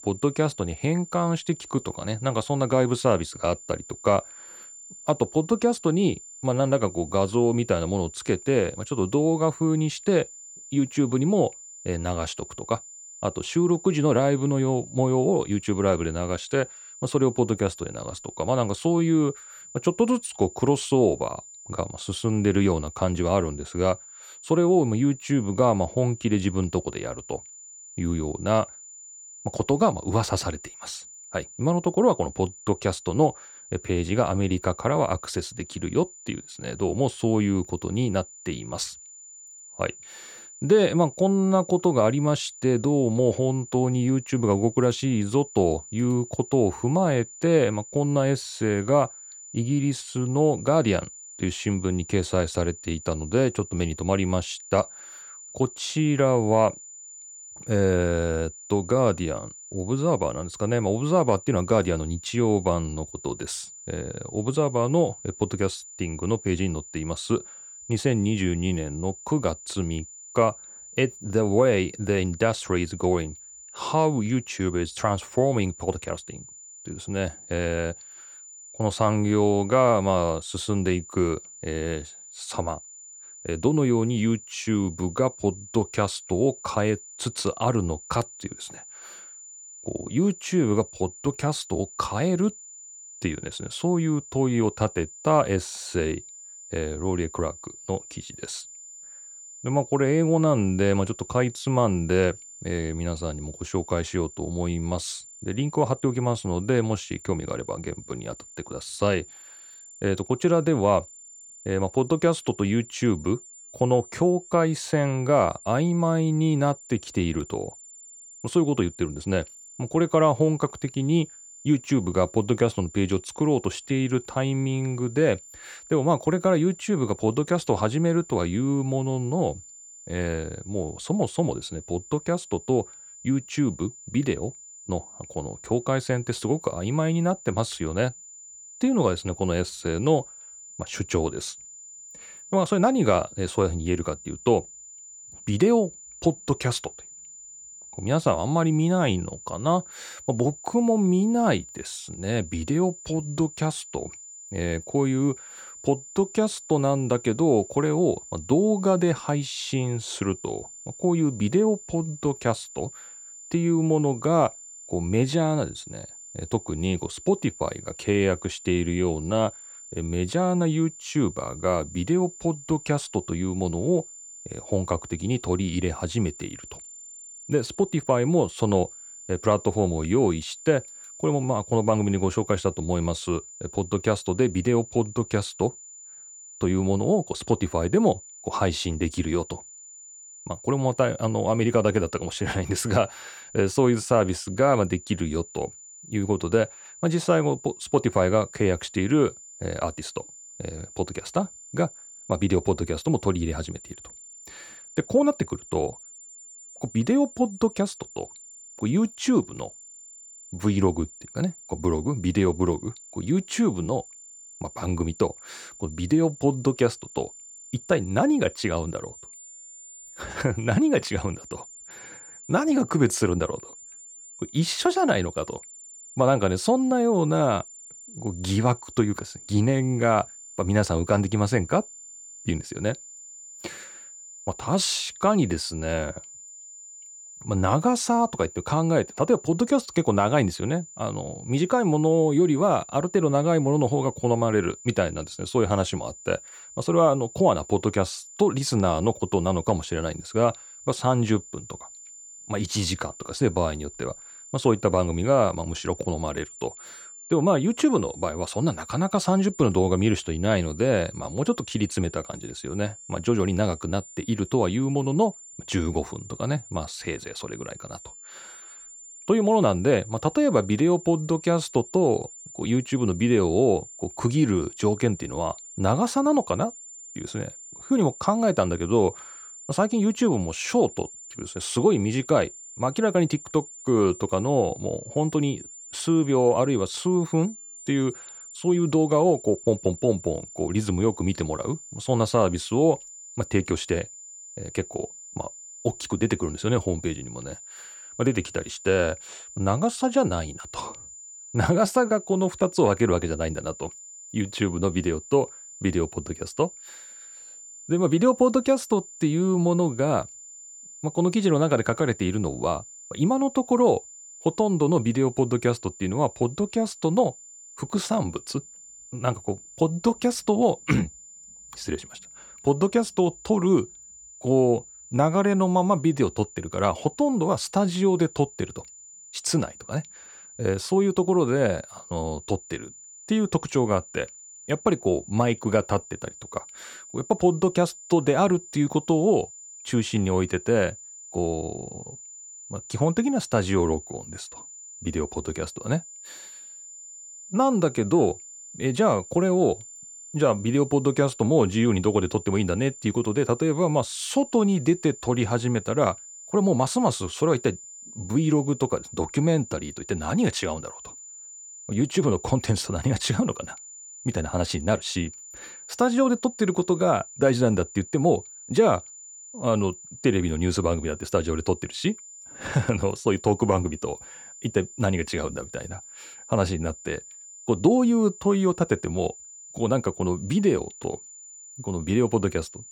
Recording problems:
high-pitched whine; noticeable; throughout; 7 kHz, 15 dB below the speech

